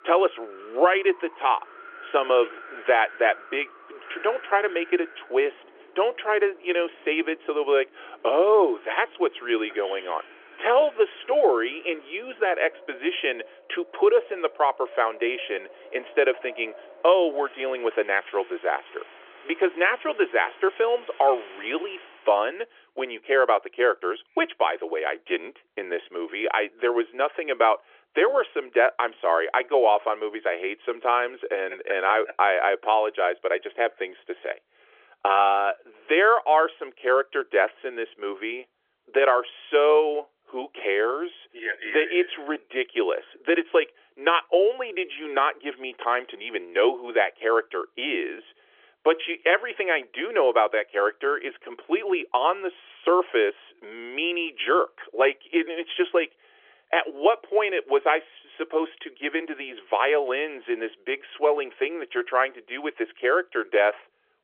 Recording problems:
phone-call audio; nothing above 3.5 kHz
wind in the background; faint; until 22 s; 20 dB below the speech

